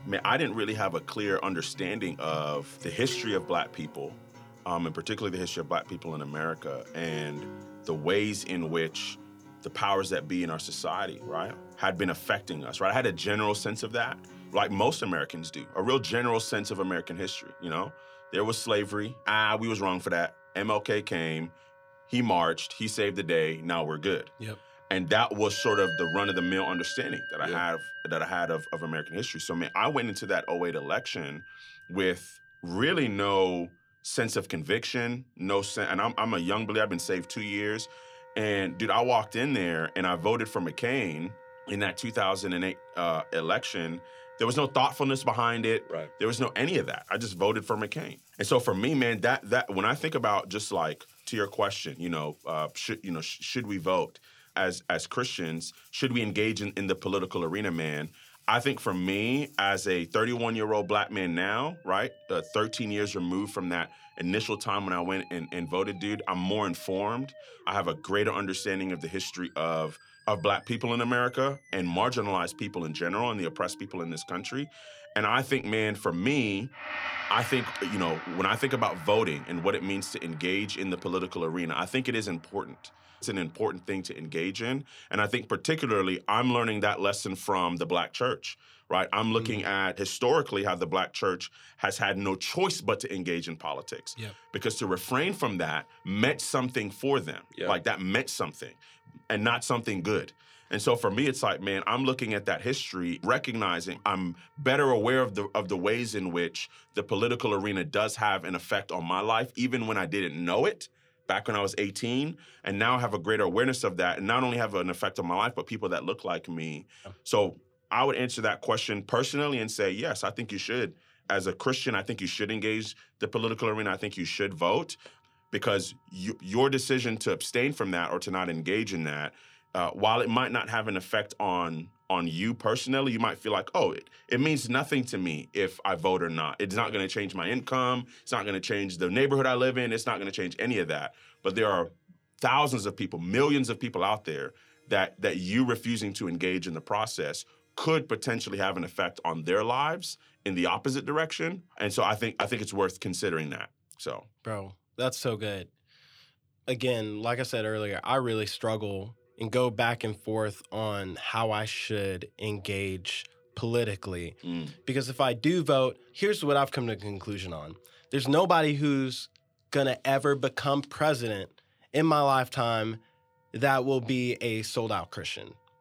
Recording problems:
background music; noticeable; throughout; 15 dB below the speech

